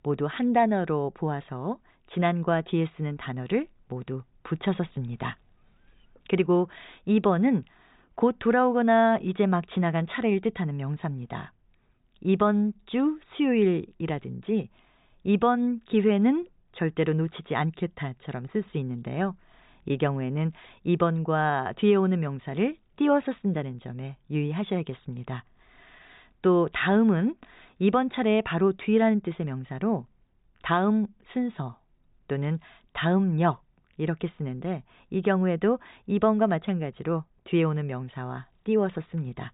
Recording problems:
high frequencies cut off; severe; nothing above 4 kHz

